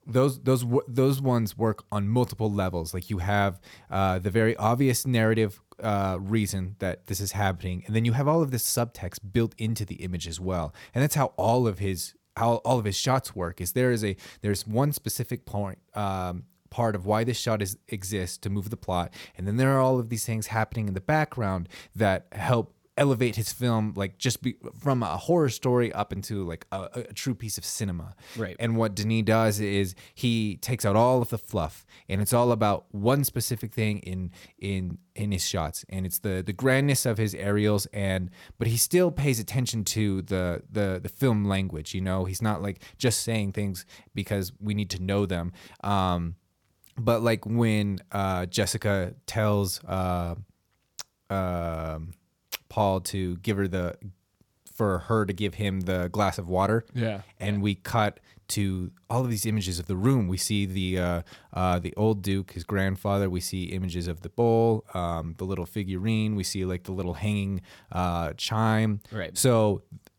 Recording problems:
none

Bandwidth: 18 kHz